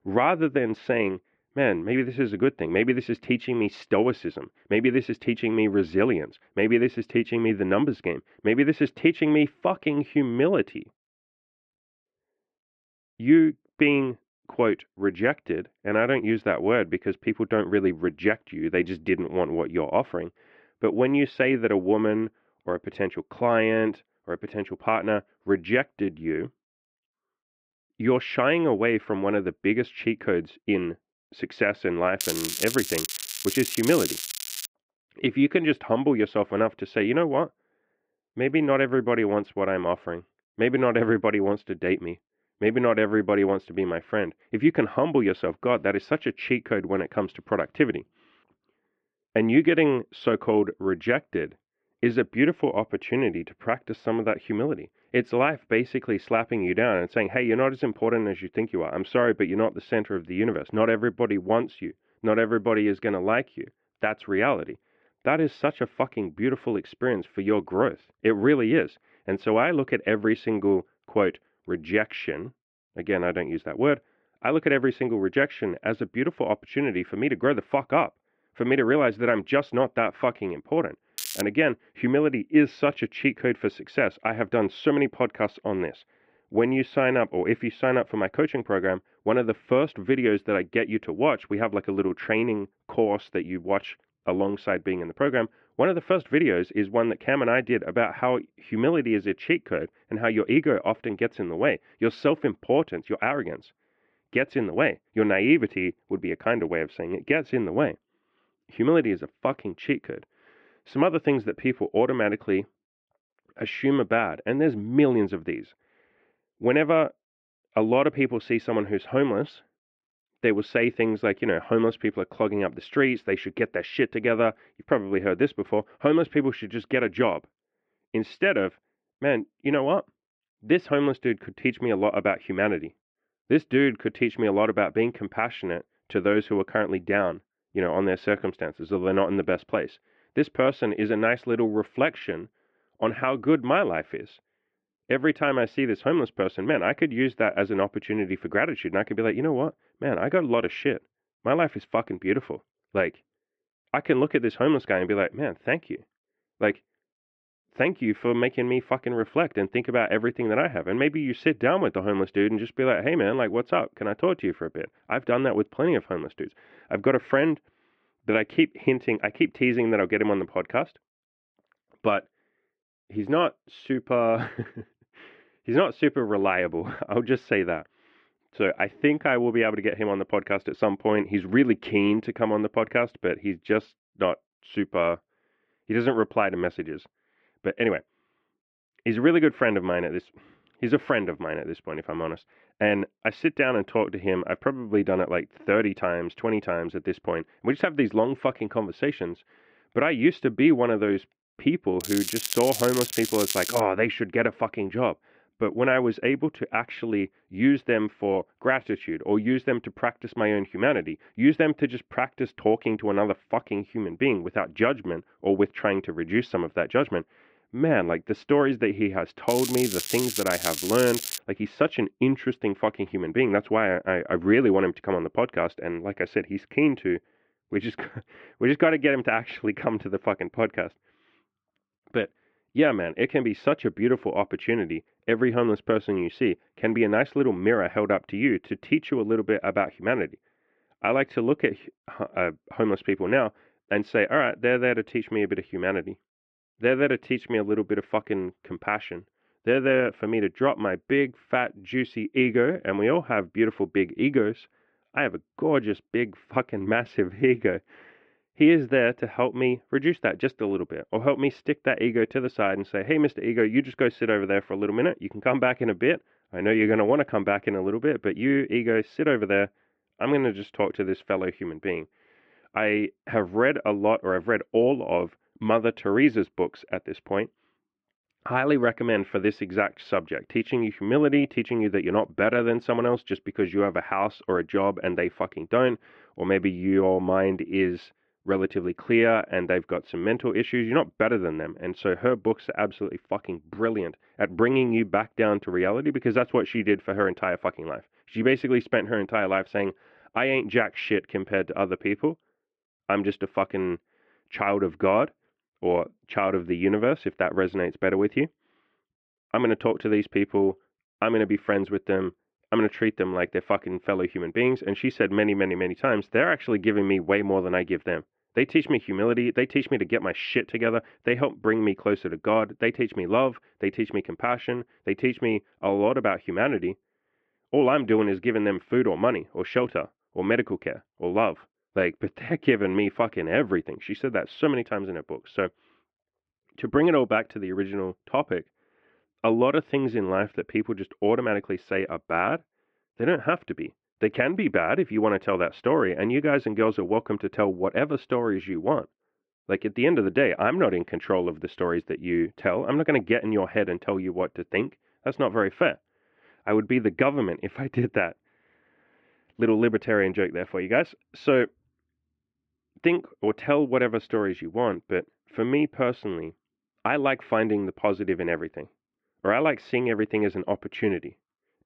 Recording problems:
muffled; very; fading above 2.5 kHz
crackling; loud; 4 times, first at 32 s; 5 dB below the speech

